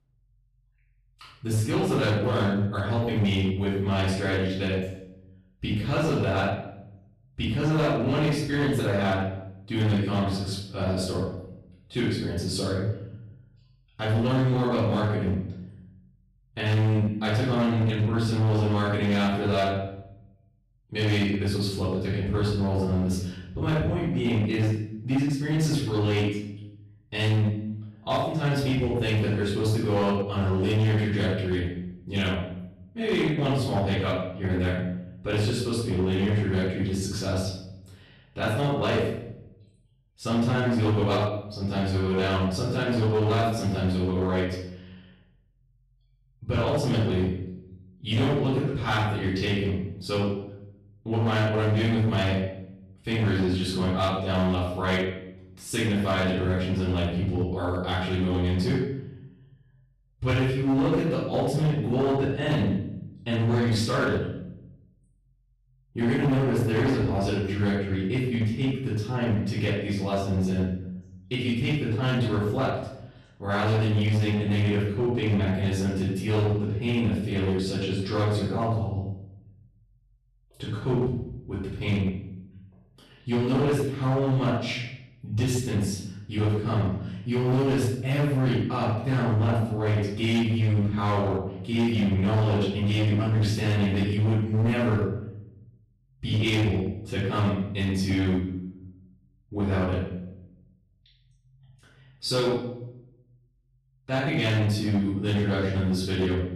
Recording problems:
off-mic speech; far
room echo; noticeable; dies away in 0.7 s
distortion; slight; 10% of the sound clipped

